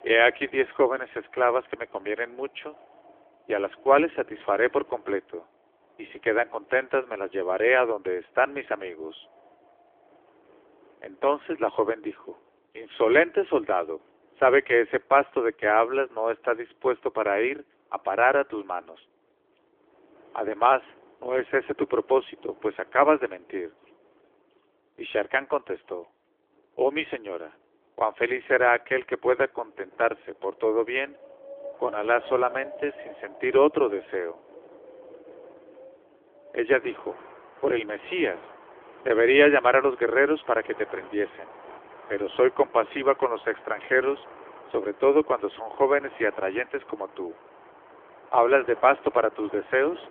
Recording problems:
phone-call audio; nothing above 3.5 kHz
wind in the background; faint; throughout; 25 dB below the speech

